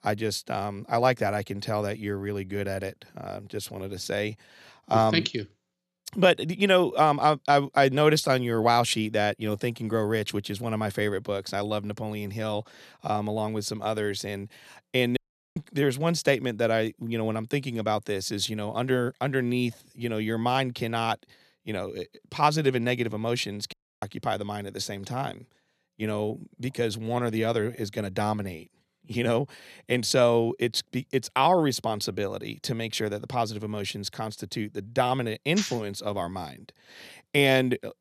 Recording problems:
audio cutting out; at 15 s and at 24 s

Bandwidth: 13.5 kHz